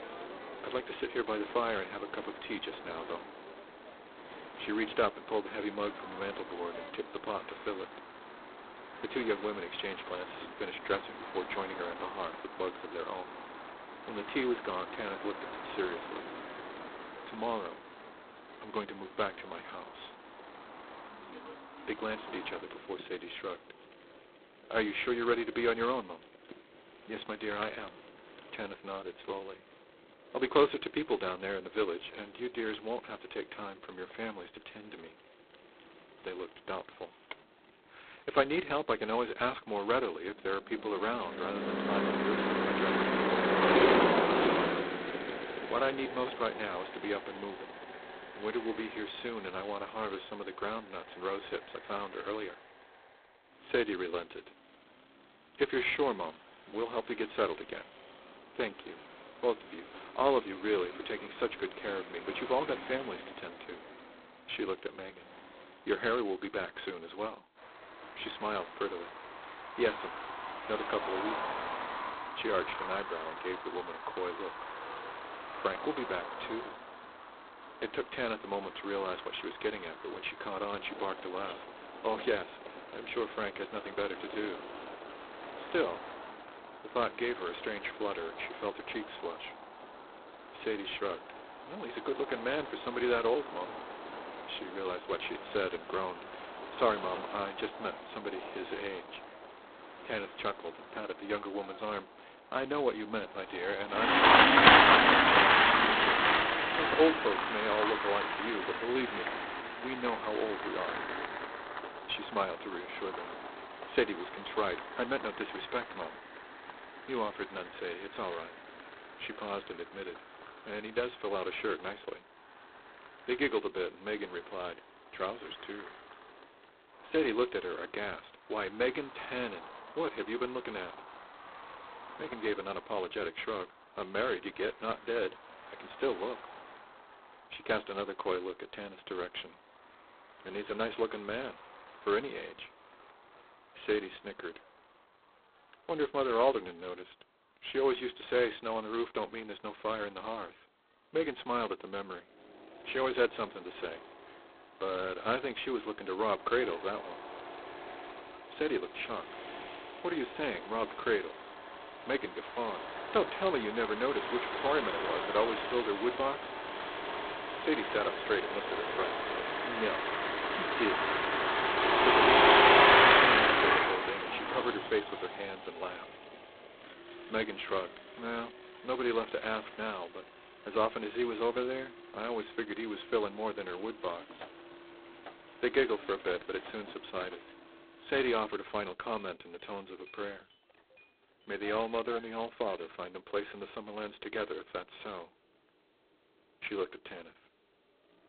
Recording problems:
phone-call audio; poor line; nothing above 4 kHz
traffic noise; very loud; throughout; 6 dB above the speech

